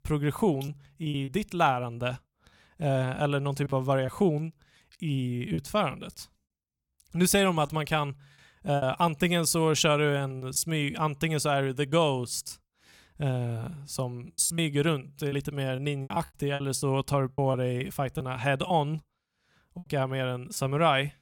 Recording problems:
choppy; very; 7% of the speech affected

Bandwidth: 17.5 kHz